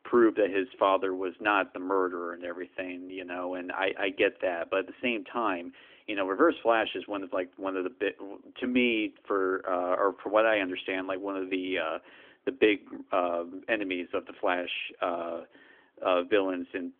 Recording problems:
phone-call audio; nothing above 3.5 kHz

